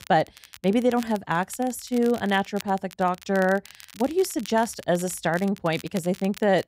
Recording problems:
crackle, like an old record; noticeable; 20 dB below the speech

